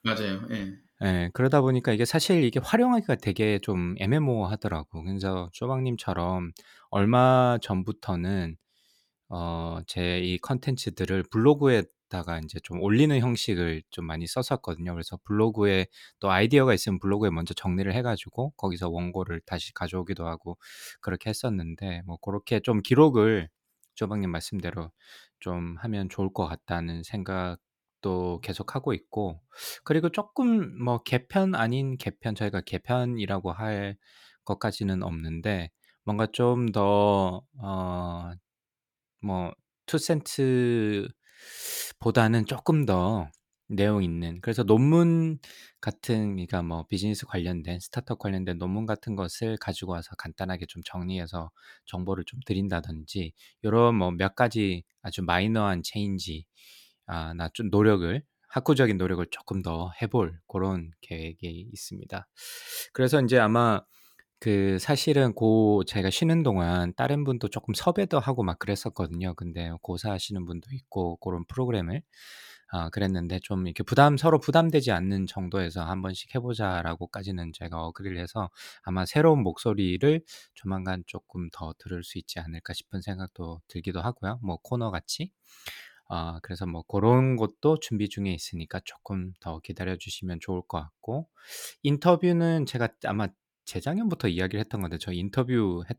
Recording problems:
none

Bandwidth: 18.5 kHz